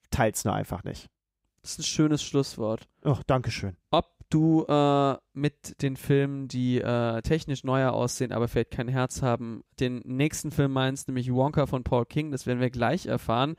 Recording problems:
none

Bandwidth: 15.5 kHz